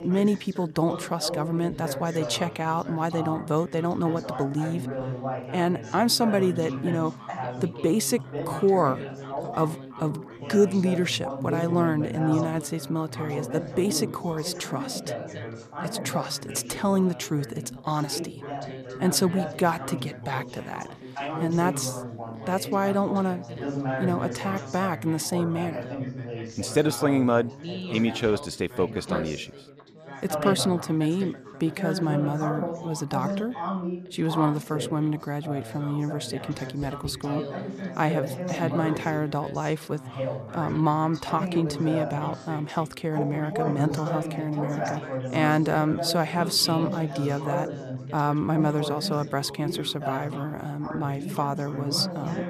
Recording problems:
background chatter; loud; throughout; 4 voices, 7 dB below the speech

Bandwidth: 14.5 kHz